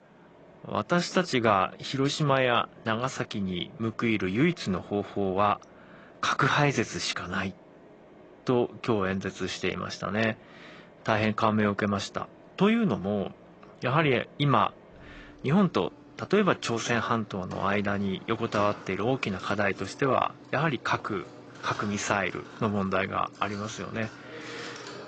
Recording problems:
high frequencies cut off; noticeable; nothing above 7.5 kHz
garbled, watery; slightly
machinery noise; faint; throughout; 20 dB below the speech

